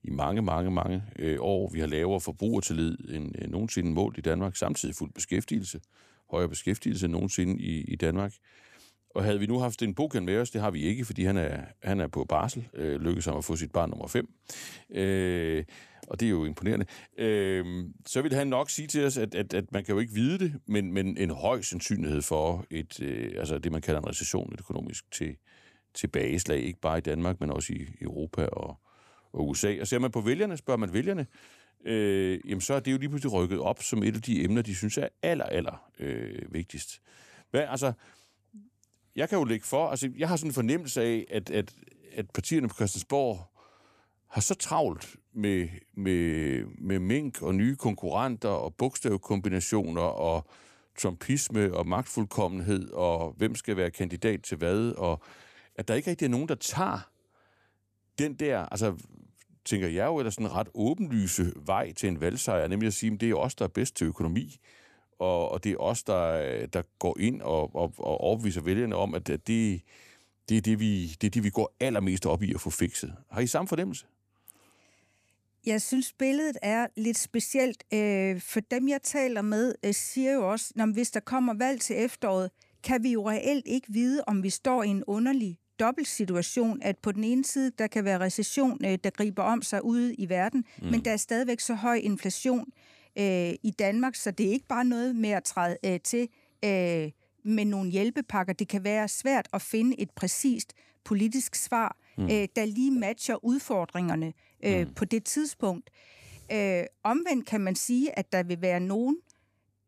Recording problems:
none

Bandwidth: 14.5 kHz